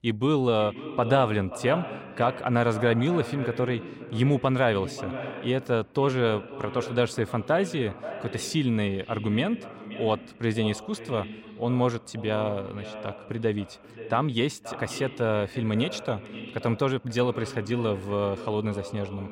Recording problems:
echo of what is said; noticeable; throughout; 530 ms later, 10 dB below the speech

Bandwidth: 16 kHz